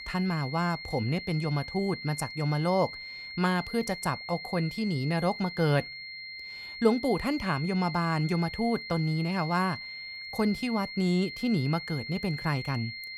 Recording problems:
high-pitched whine; loud; throughout; 2 kHz, 9 dB below the speech

